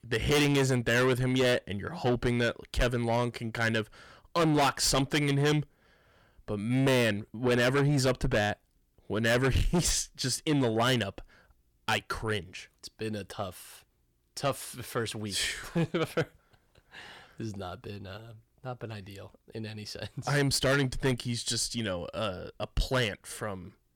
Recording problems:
distortion; heavy; 6 dB below the speech

